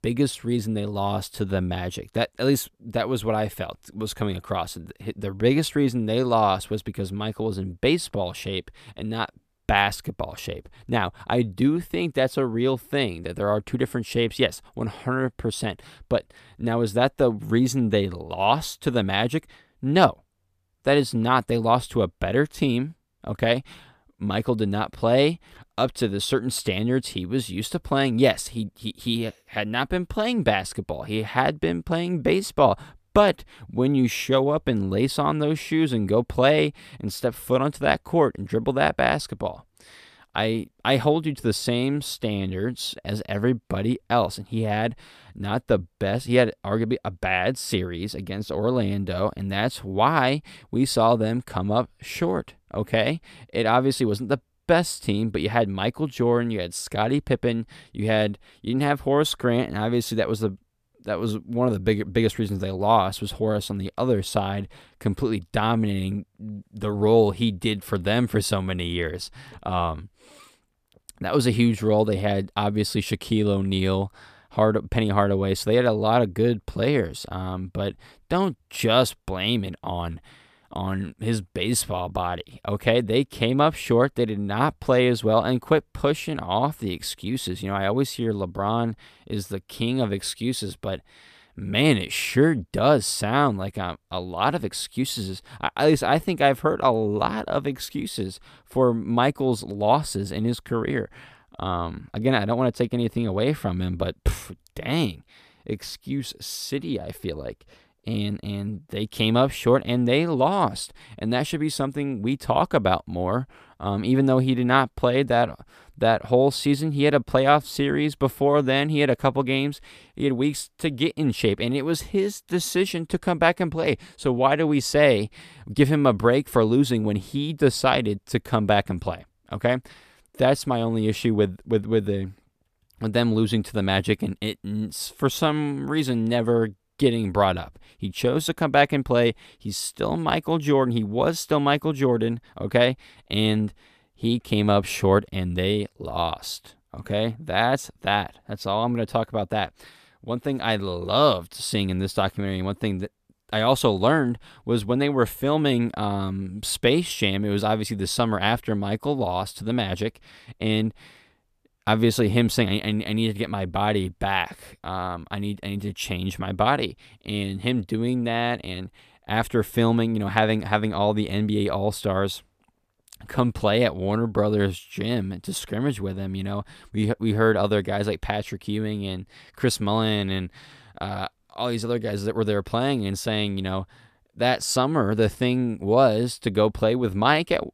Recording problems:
none

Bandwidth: 14.5 kHz